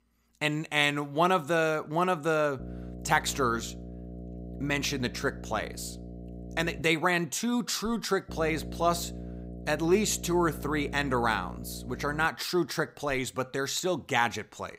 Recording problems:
electrical hum; faint; from 2.5 to 7 s and from 8.5 to 12 s; 60 Hz, 20 dB below the speech

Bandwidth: 15.5 kHz